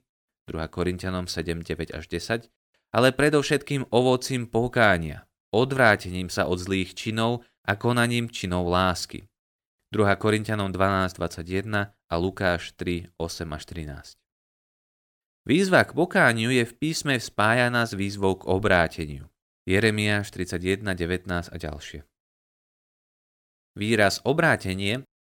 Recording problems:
none

